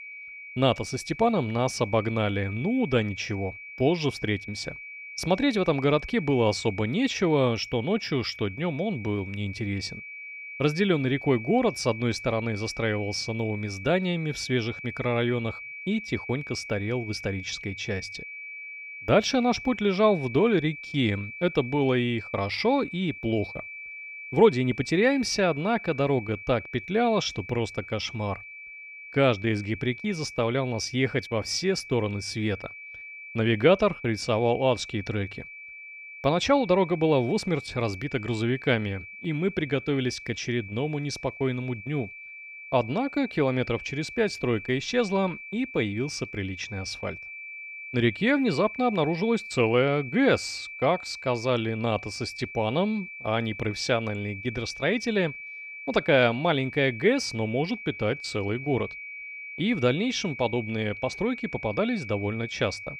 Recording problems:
high-pitched whine; noticeable; throughout; 2.5 kHz, 10 dB below the speech

